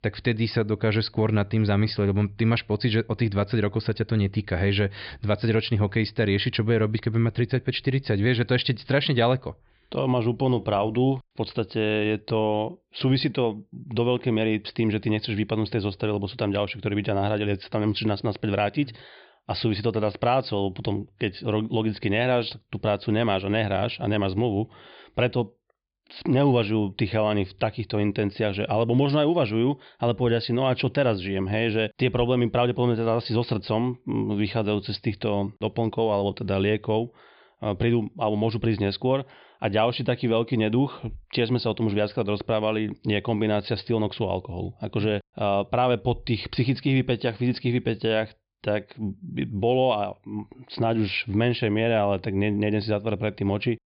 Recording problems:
high frequencies cut off; severe; nothing above 5 kHz

